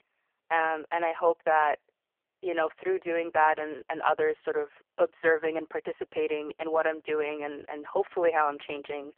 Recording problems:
phone-call audio; poor line

